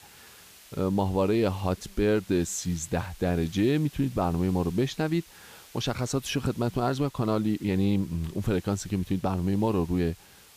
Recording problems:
hiss; faint; throughout; 25 dB below the speech

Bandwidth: 15 kHz